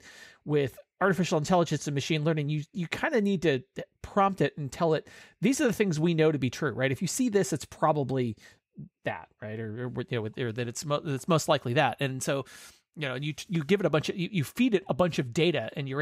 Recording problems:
abrupt cut into speech; at the end

